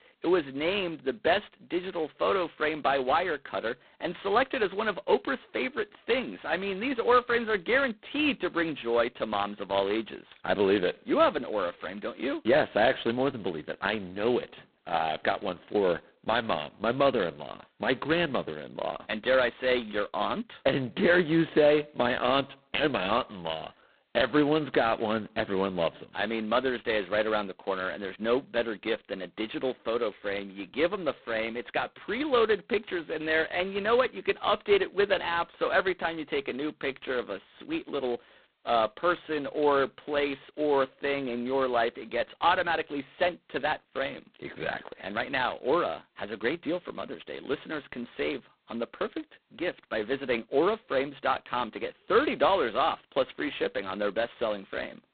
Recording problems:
phone-call audio; poor line; nothing above 4 kHz

